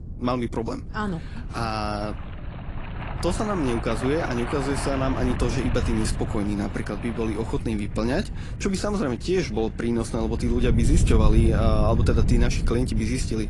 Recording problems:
garbled, watery; slightly; nothing above 10.5 kHz
rain or running water; noticeable; throughout; 10 dB below the speech
wind noise on the microphone; occasional gusts; 15 dB below the speech

